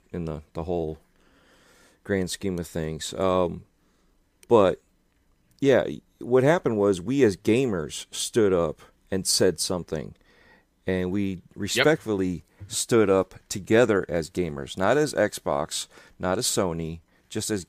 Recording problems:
none

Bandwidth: 15 kHz